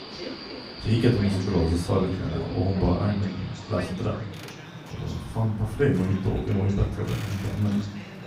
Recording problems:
off-mic speech; far
room echo; slight; dies away in 0.4 s
train or aircraft noise; noticeable; throughout; 15 dB below the speech
voice in the background; noticeable; throughout; 20 dB below the speech

